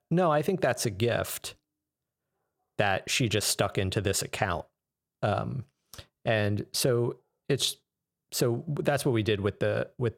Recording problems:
none

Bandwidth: 16.5 kHz